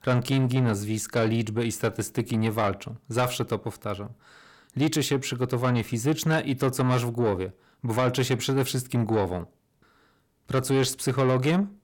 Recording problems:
distortion; slight; 10 dB below the speech

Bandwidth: 17 kHz